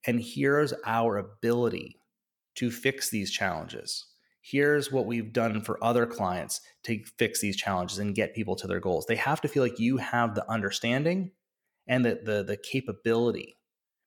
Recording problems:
none

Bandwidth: 18.5 kHz